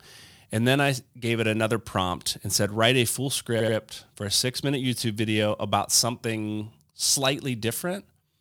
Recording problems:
audio stuttering; at 3.5 s

